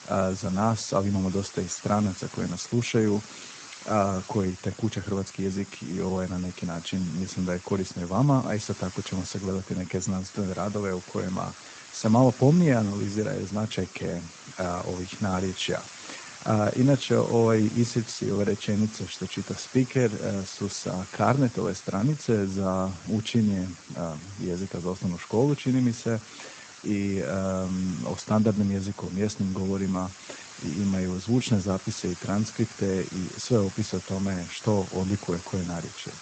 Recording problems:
garbled, watery; slightly; nothing above 7.5 kHz
hiss; noticeable; throughout; 15 dB below the speech

